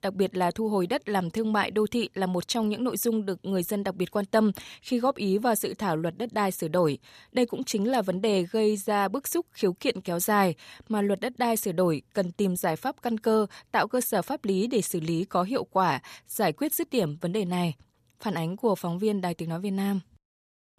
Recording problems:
none

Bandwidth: 14.5 kHz